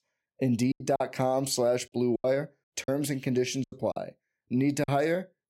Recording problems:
choppy; very; 10% of the speech affected

